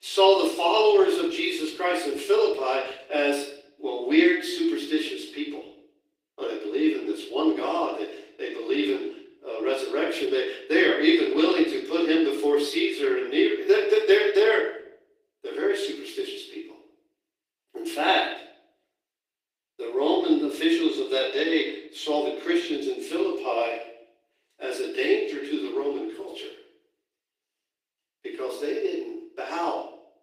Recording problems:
off-mic speech; far
room echo; noticeable; dies away in 0.5 s
thin; somewhat; fading below 300 Hz
garbled, watery; slightly; nothing above 15.5 kHz

